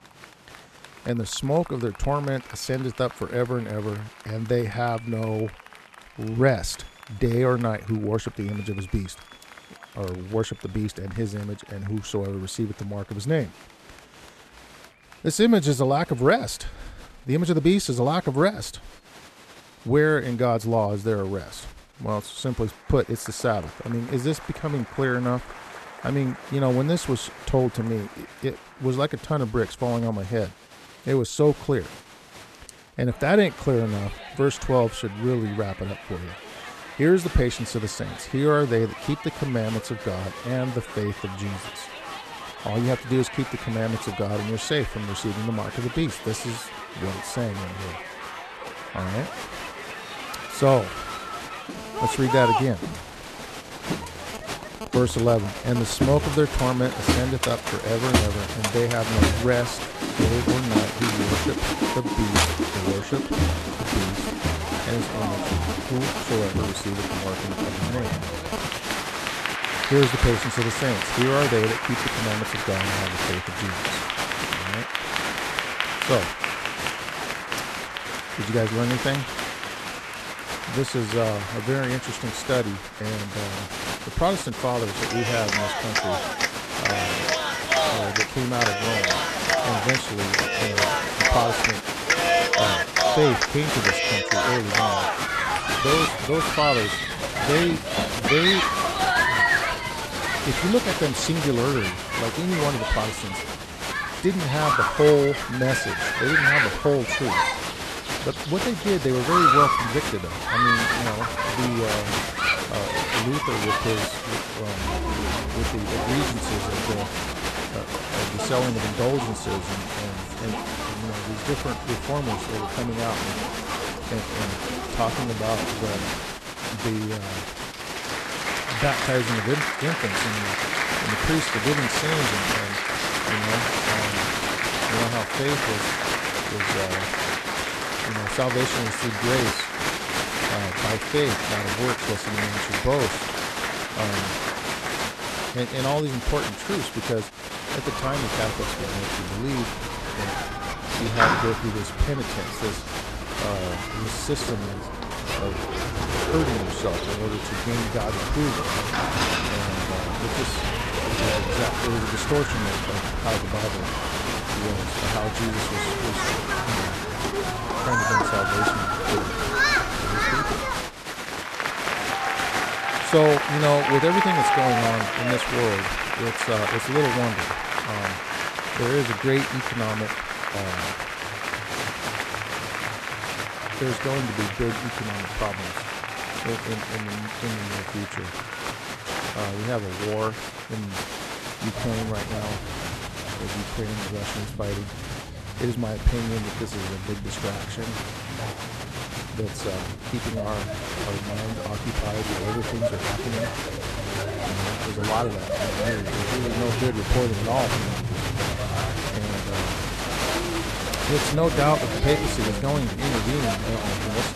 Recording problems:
crowd noise; very loud; throughout; 1 dB above the speech

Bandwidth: 13.5 kHz